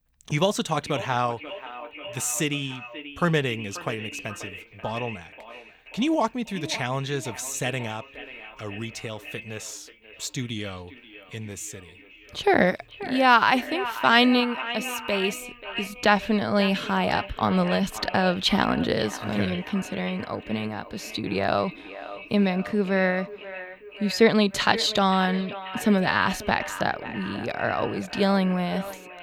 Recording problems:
echo of what is said; strong; throughout; 540 ms later, 10 dB below the speech

